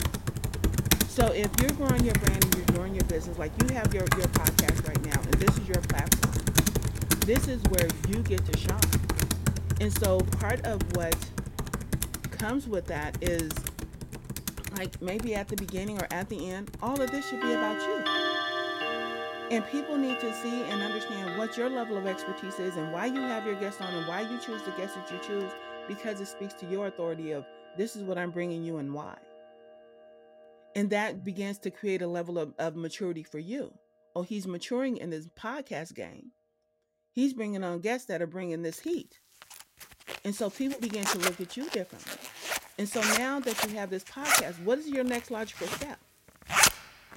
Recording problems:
household noises; very loud; throughout; 4 dB above the speech

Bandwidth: 16 kHz